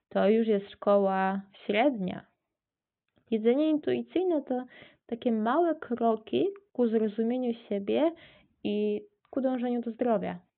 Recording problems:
high frequencies cut off; severe; nothing above 3.5 kHz

